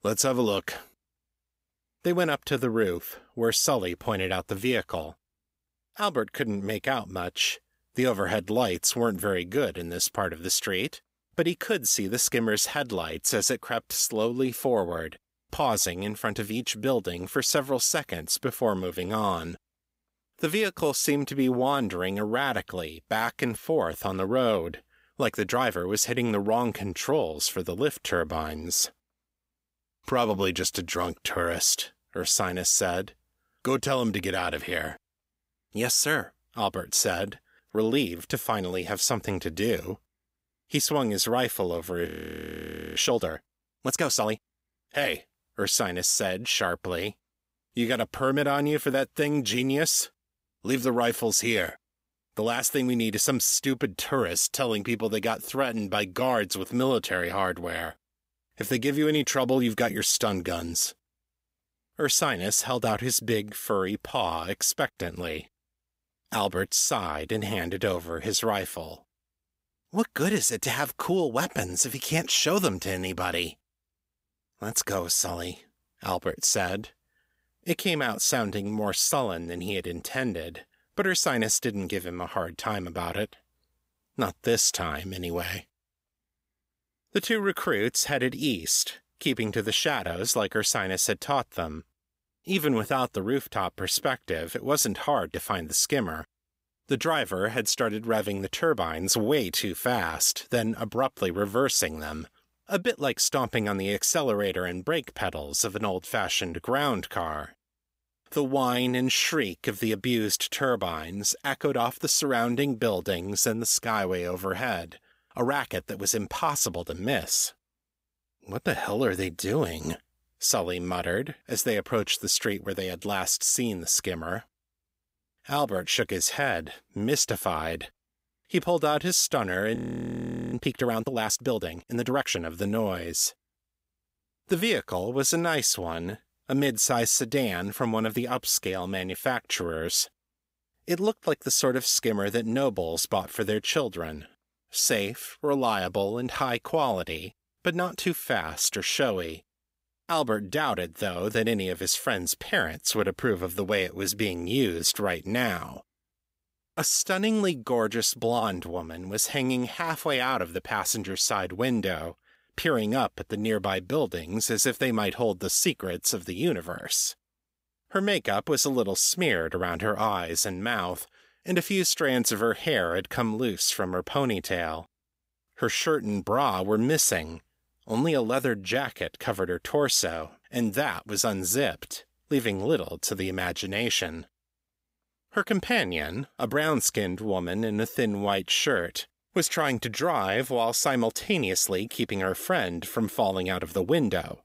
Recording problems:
audio freezing; at 42 s for 1 s and at 2:10 for 1 s

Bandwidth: 15.5 kHz